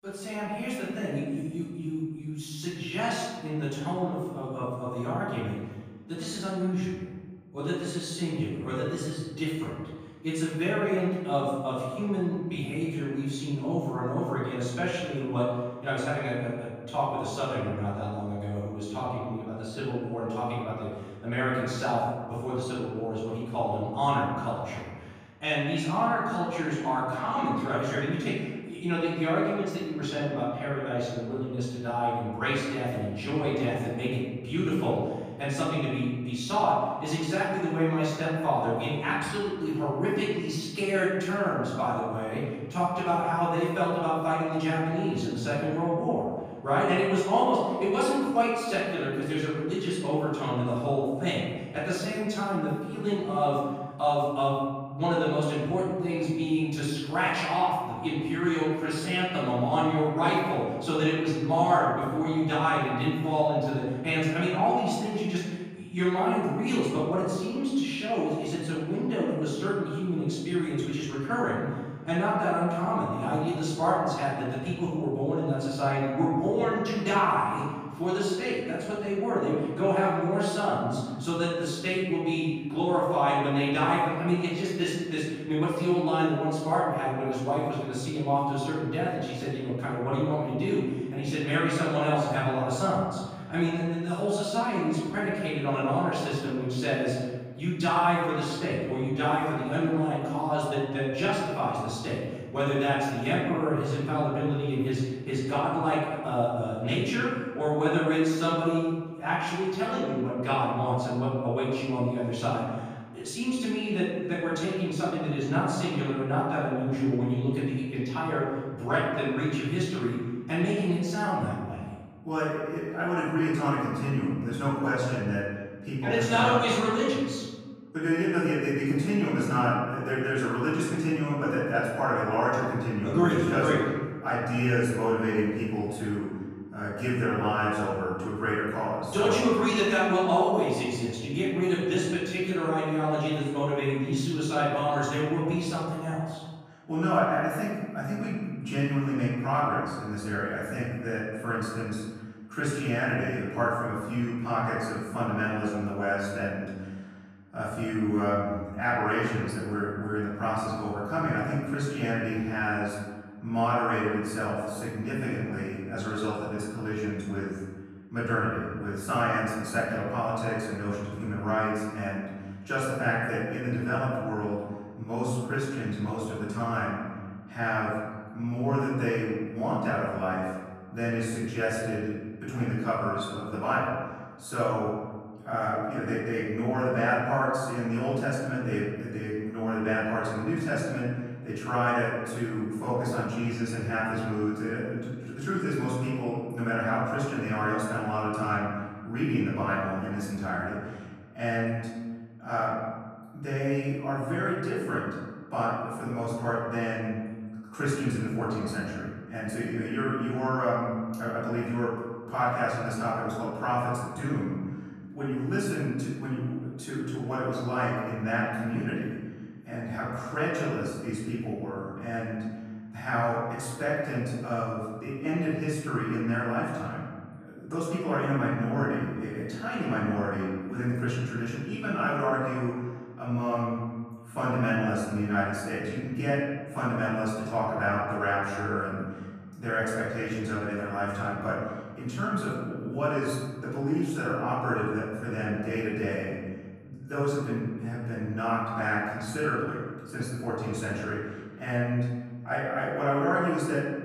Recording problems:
room echo; strong; dies away in 1.4 s
off-mic speech; far

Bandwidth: 15 kHz